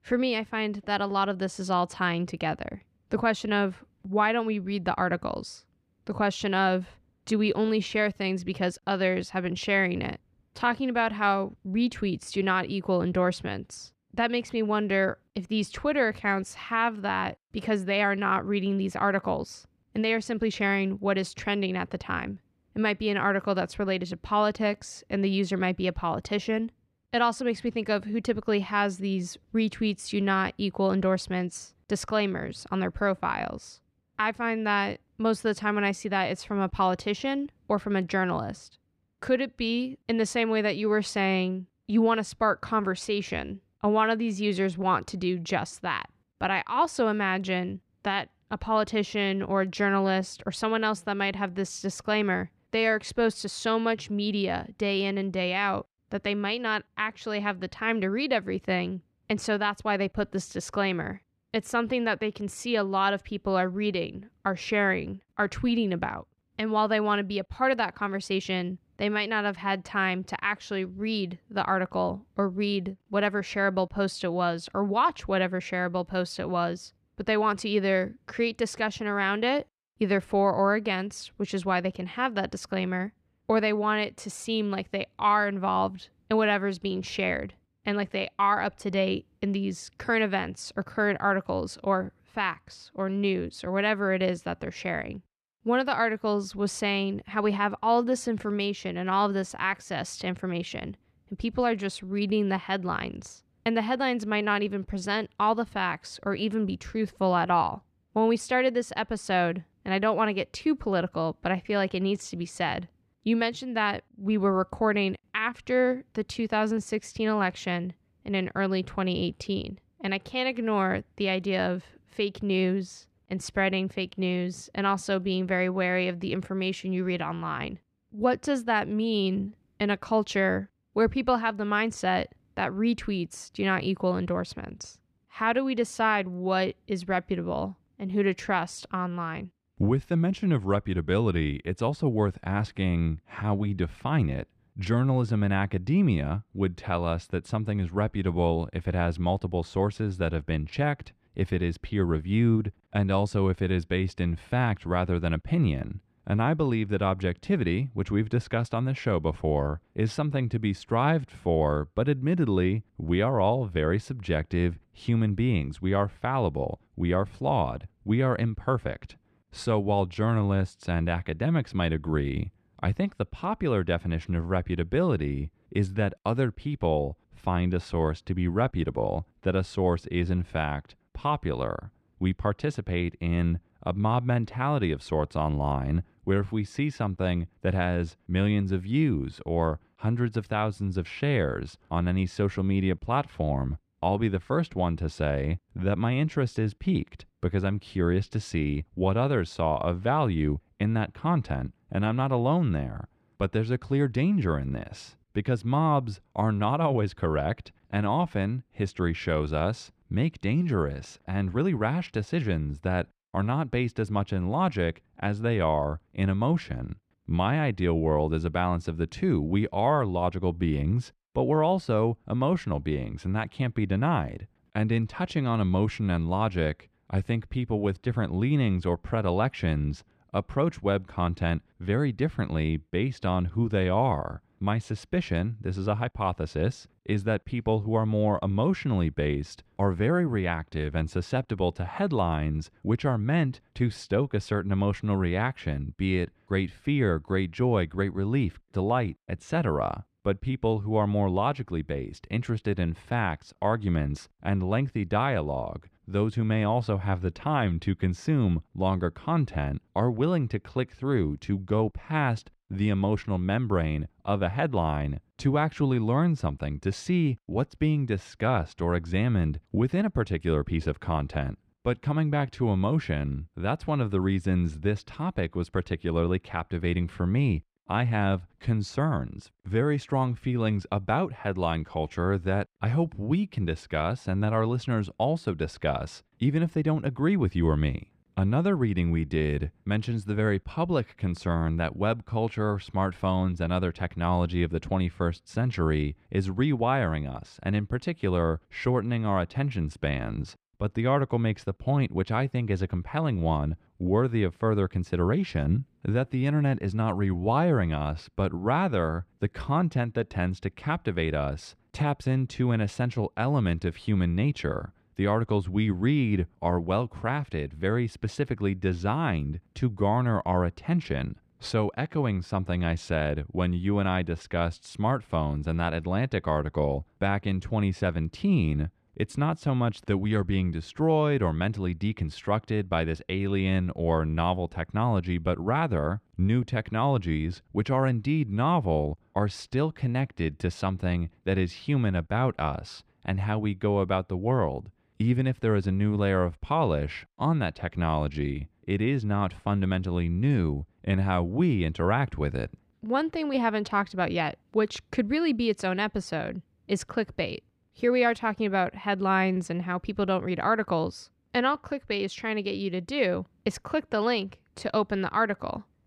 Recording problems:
muffled; slightly; fading above 3.5 kHz

